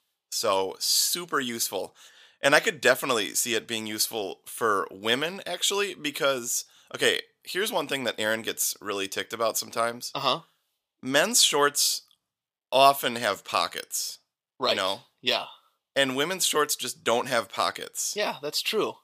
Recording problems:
thin; somewhat; fading below 450 Hz

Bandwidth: 15 kHz